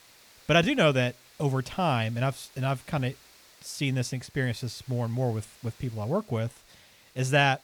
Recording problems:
hiss; faint; throughout; 25 dB below the speech

